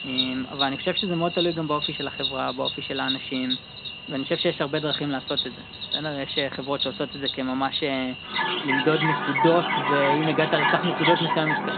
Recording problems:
high frequencies cut off; severe; nothing above 4 kHz
animal sounds; loud; throughout; as loud as the speech

